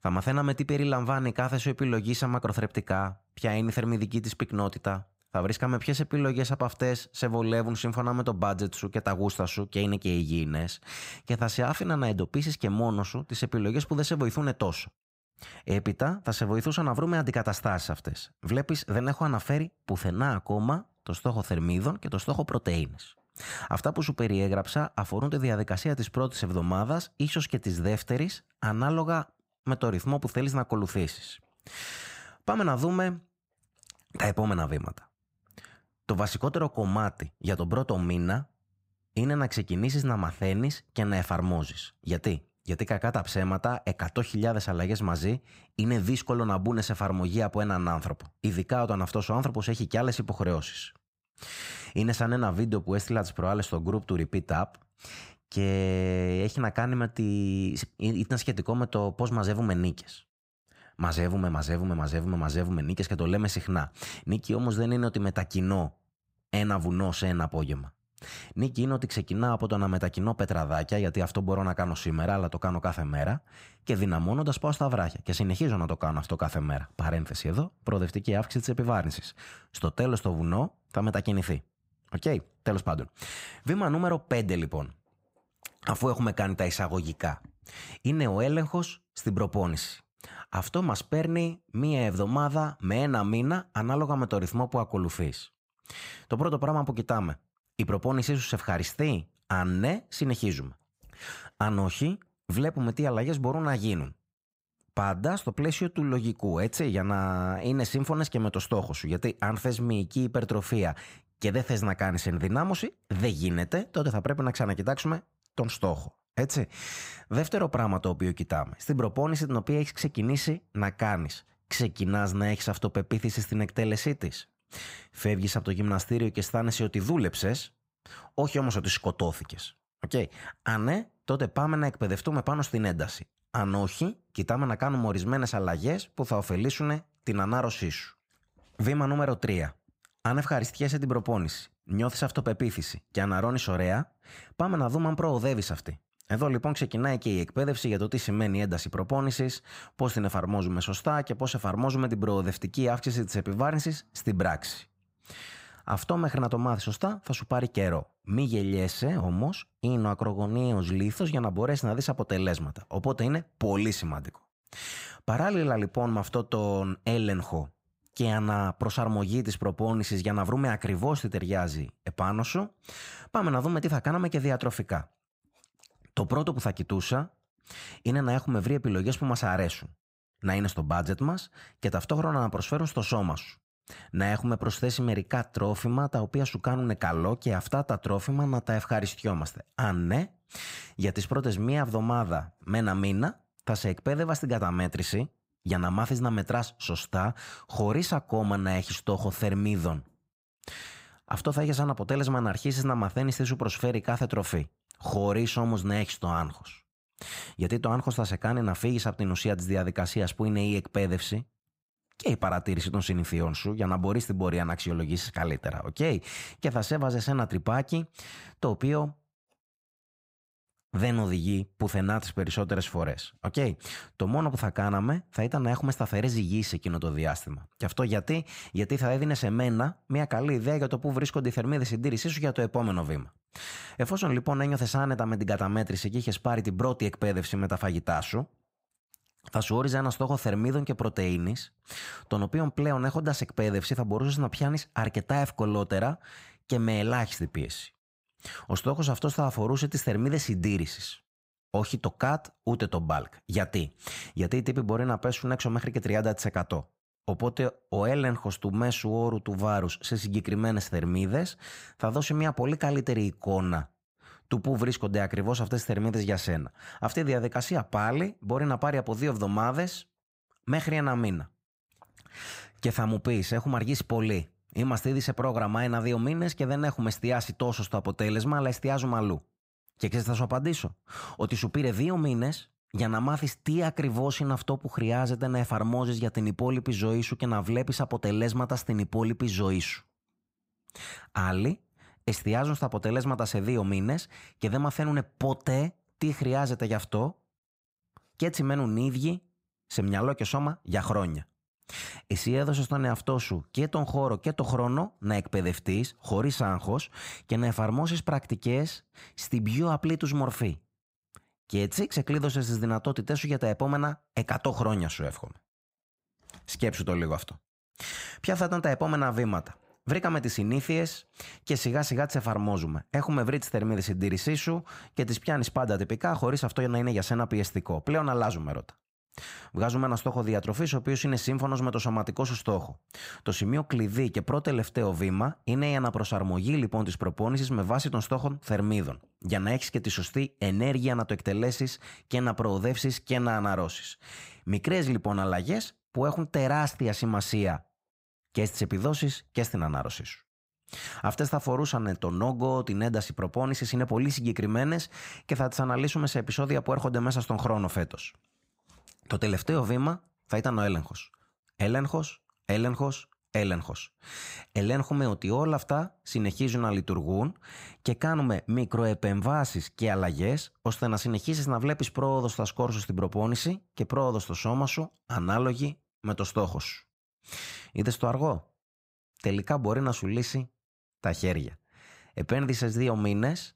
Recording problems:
none

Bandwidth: 15.5 kHz